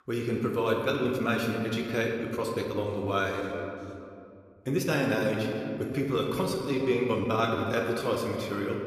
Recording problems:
room echo; noticeable; dies away in 2 s
off-mic speech; somewhat distant
uneven, jittery; strongly; from 1 to 8 s

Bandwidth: 14.5 kHz